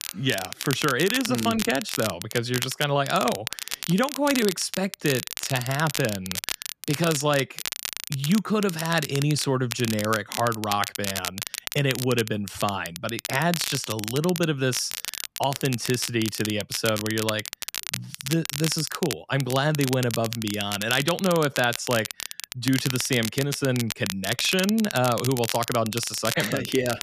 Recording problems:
crackle, like an old record; loud; 6 dB below the speech

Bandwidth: 14.5 kHz